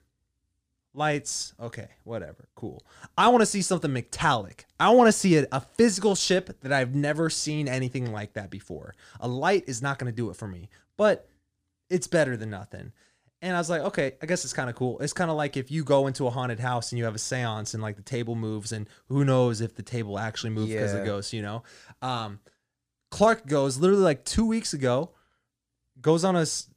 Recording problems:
none

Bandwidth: 15 kHz